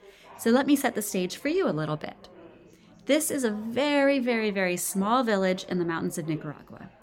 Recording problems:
background chatter; faint; throughout; 4 voices, 25 dB below the speech

